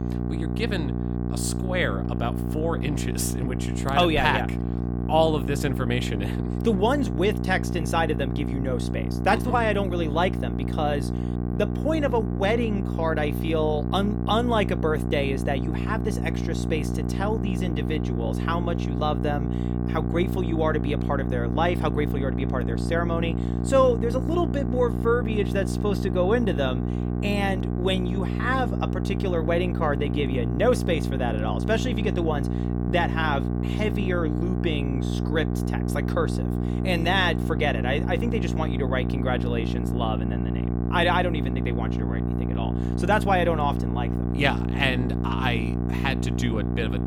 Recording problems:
electrical hum; loud; throughout; 60 Hz, 8 dB below the speech

